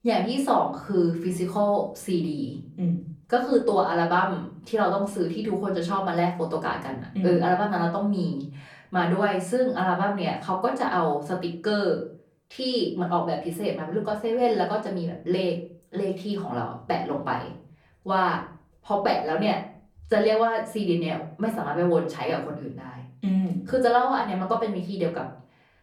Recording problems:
off-mic speech; far
room echo; slight; dies away in 0.4 s

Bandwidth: 18.5 kHz